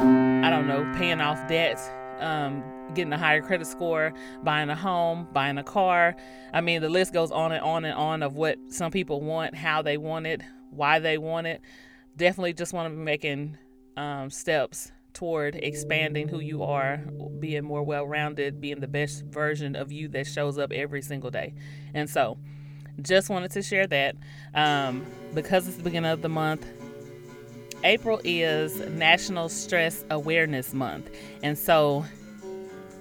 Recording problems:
background music; noticeable; throughout; 10 dB below the speech

